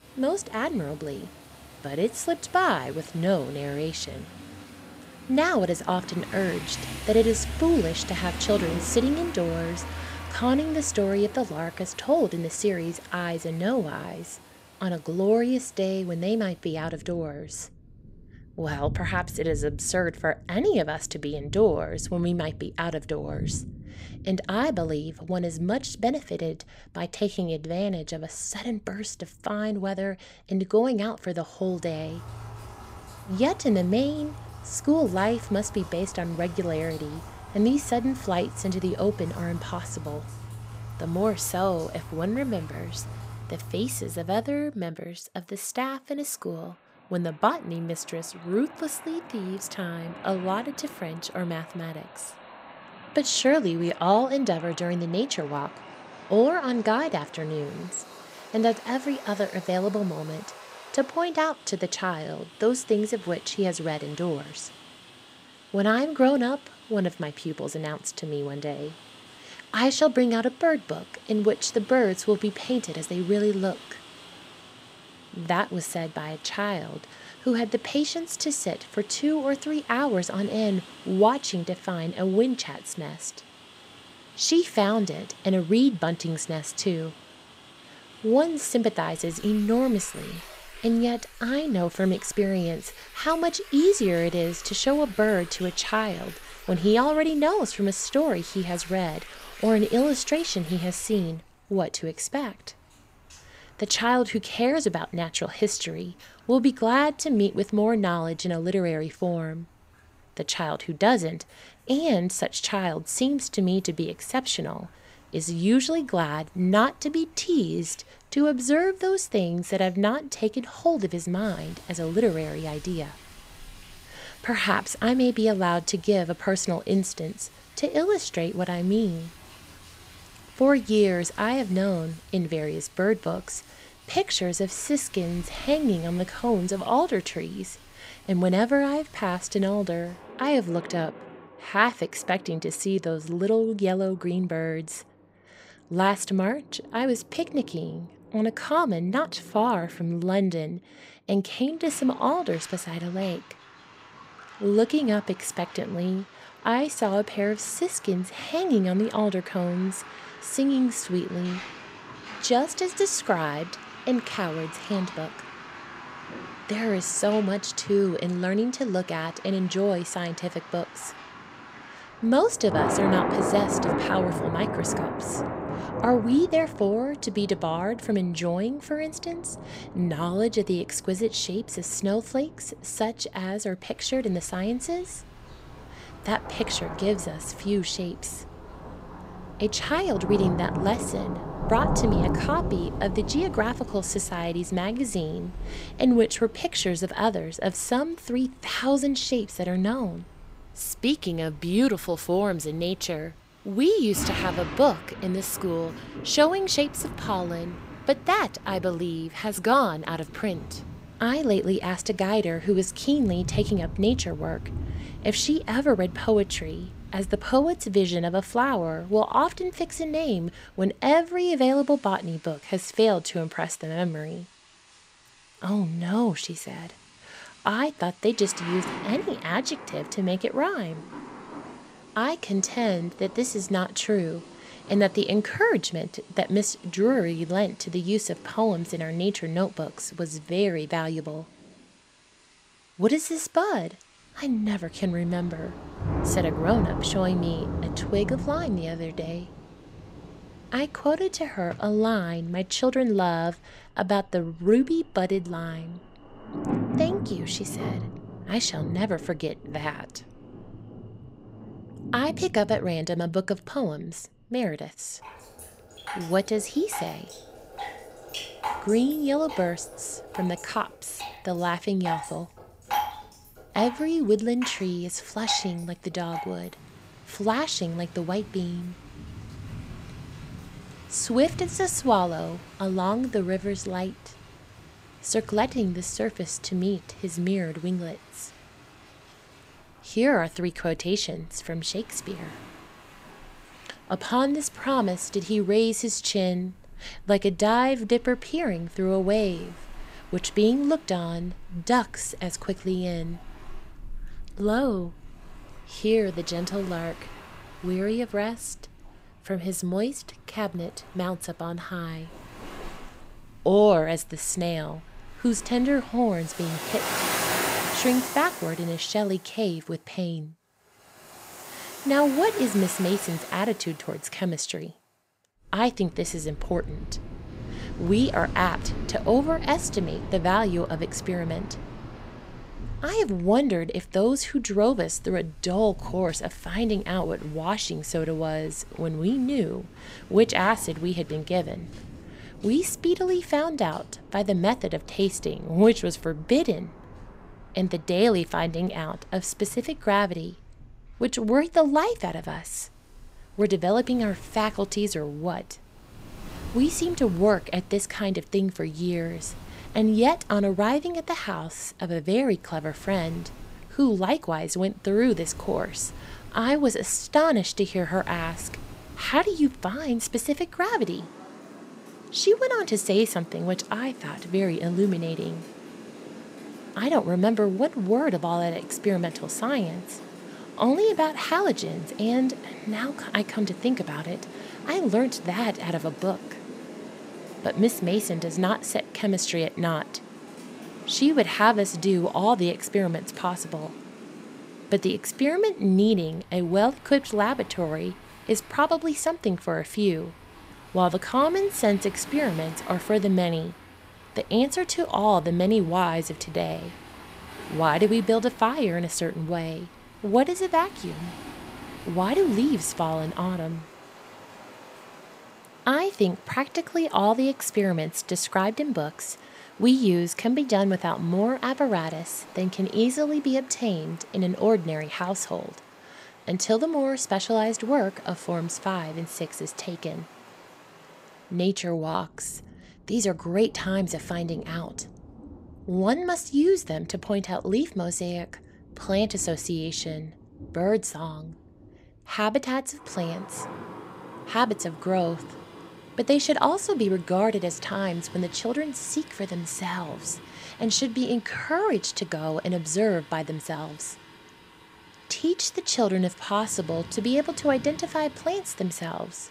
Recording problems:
rain or running water; noticeable; throughout; 15 dB below the speech

